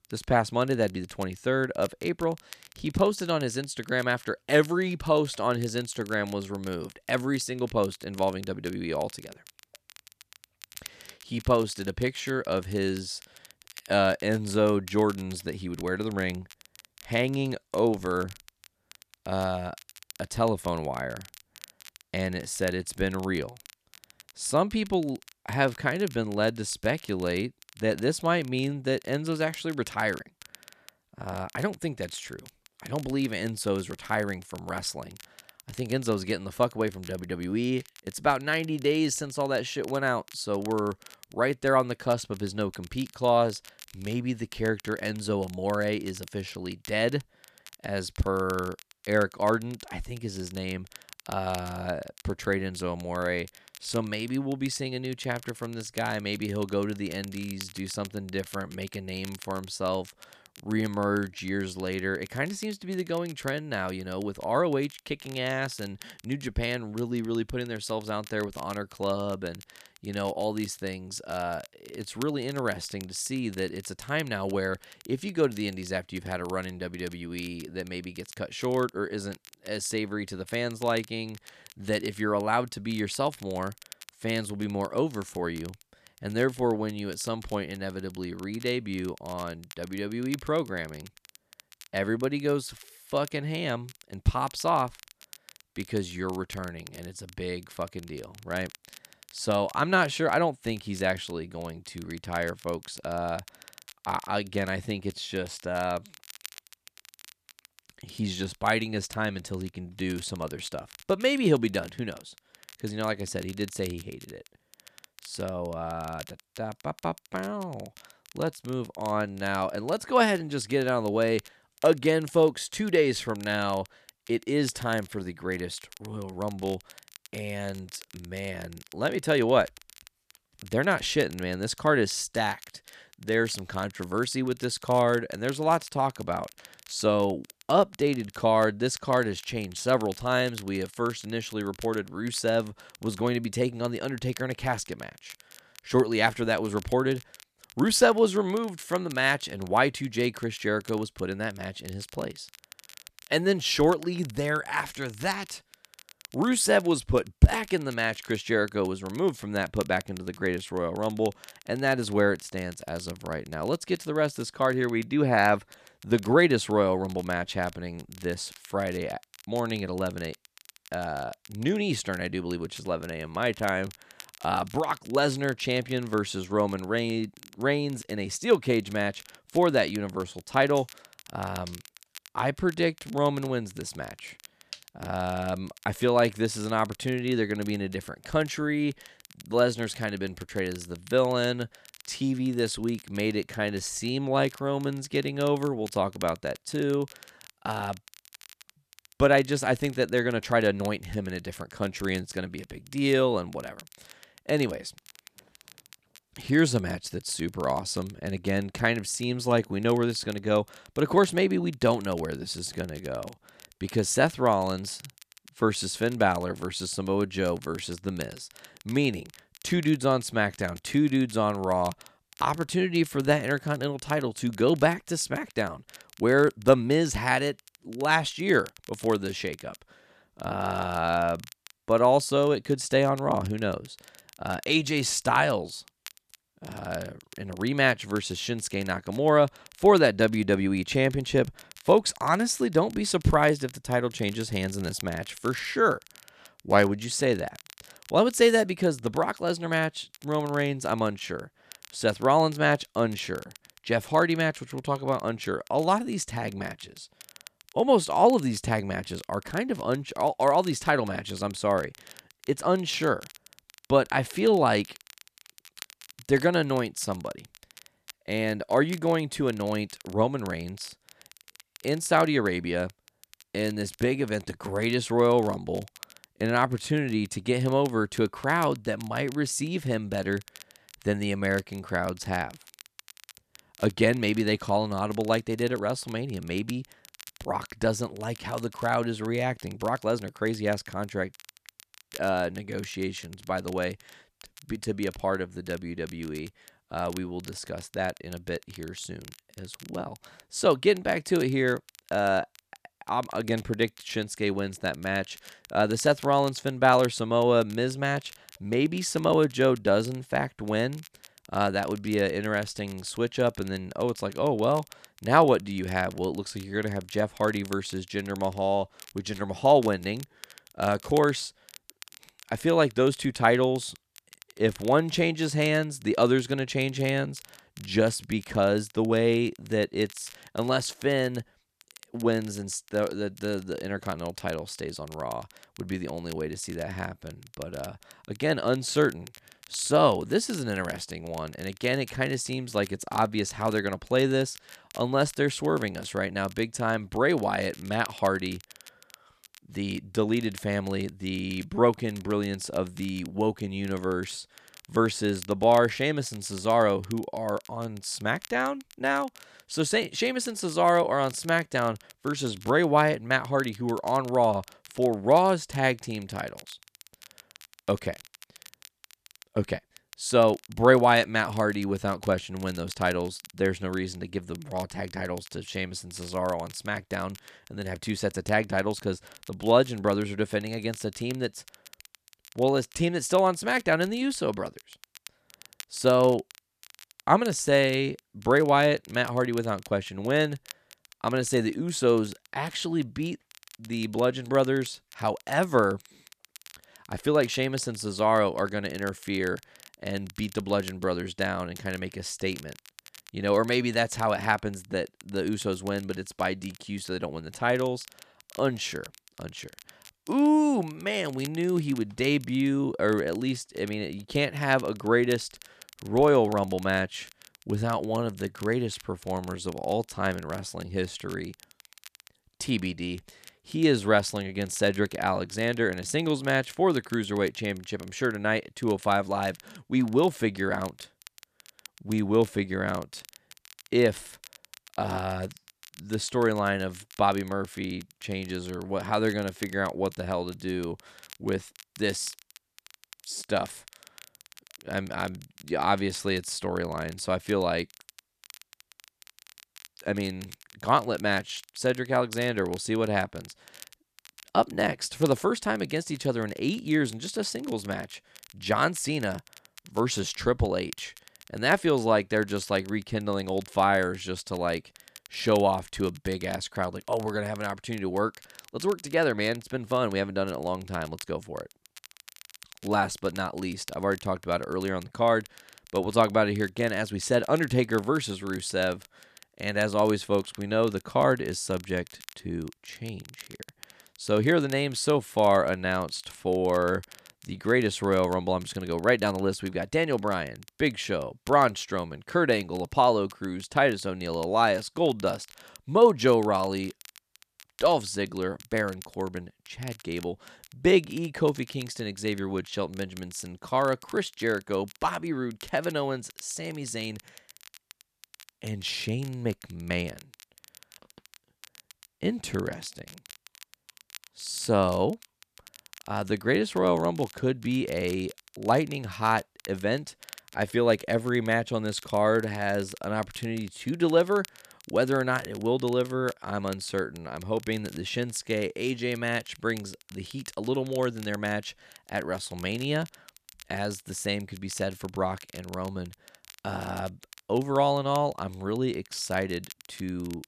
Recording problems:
crackle, like an old record; faint; 20 dB below the speech

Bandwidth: 14.5 kHz